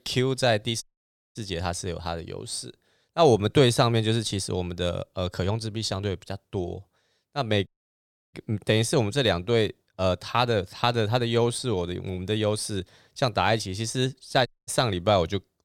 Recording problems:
audio cutting out; at 1 s for 0.5 s, at 7.5 s for 0.5 s and at 14 s

